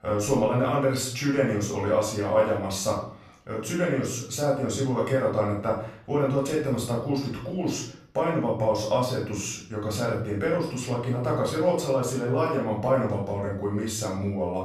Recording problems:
off-mic speech; far
room echo; noticeable; dies away in 0.5 s

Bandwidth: 13.5 kHz